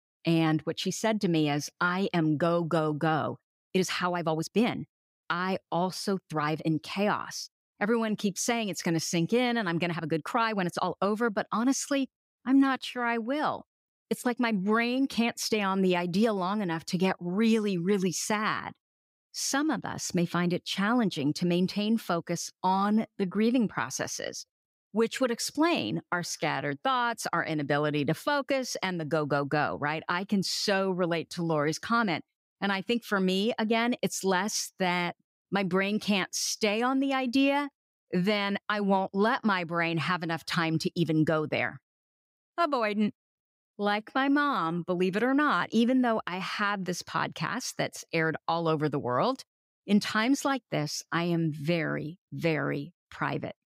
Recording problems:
uneven, jittery; strongly; from 3.5 to 51 s

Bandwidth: 15.5 kHz